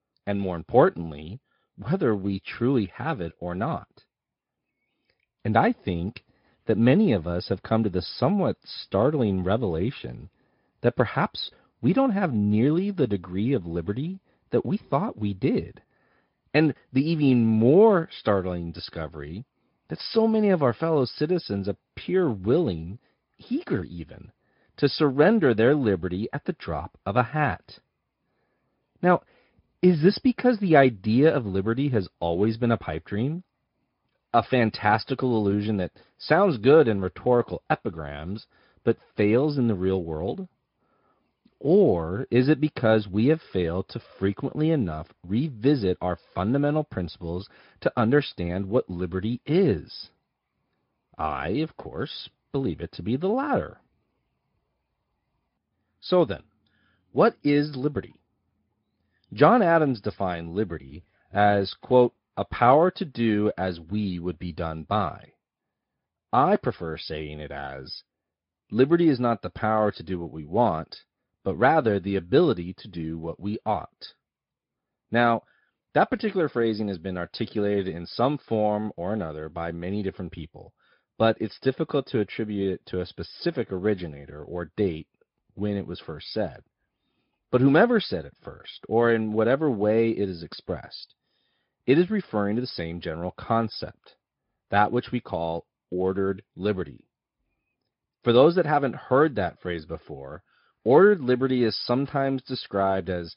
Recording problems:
high frequencies cut off; noticeable; nothing above 5 kHz
garbled, watery; slightly

